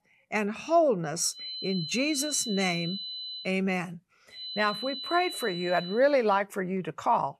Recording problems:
high-pitched whine; loud; from 1.5 to 3.5 s and from 4.5 to 6 s; 4 kHz, 7 dB below the speech

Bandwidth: 15 kHz